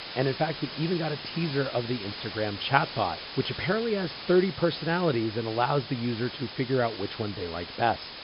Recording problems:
high frequencies cut off; noticeable; nothing above 5.5 kHz
hiss; loud; throughout; 9 dB below the speech

